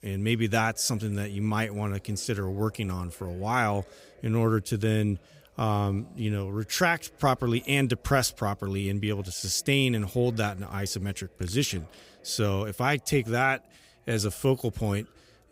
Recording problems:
chatter from many people; faint; throughout; 30 dB below the speech

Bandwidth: 15.5 kHz